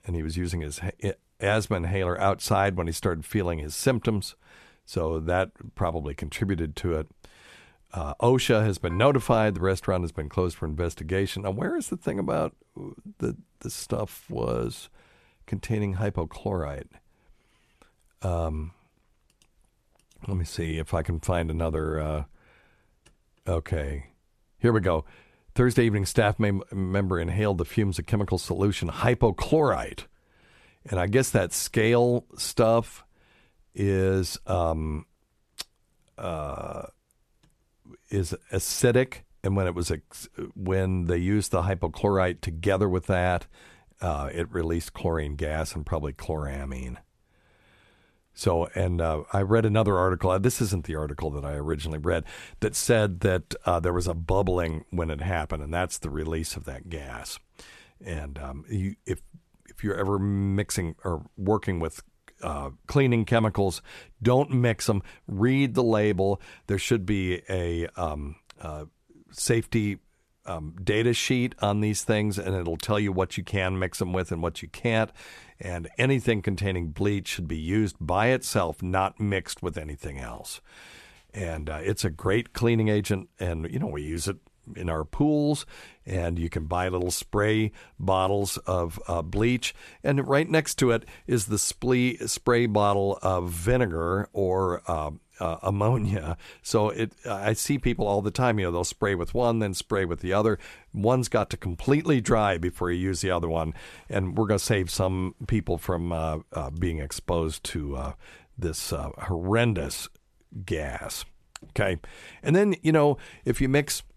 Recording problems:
none

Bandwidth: 13.5 kHz